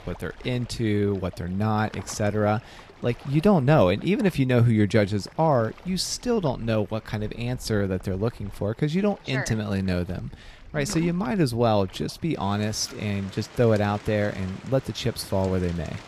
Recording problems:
rain or running water; faint; throughout; 20 dB below the speech

